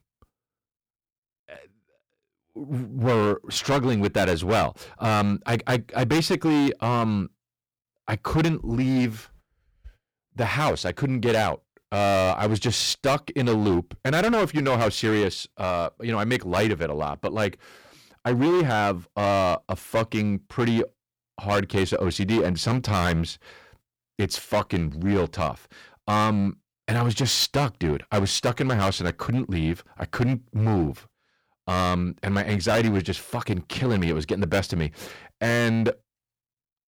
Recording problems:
distortion; heavy; 10% of the sound clipped

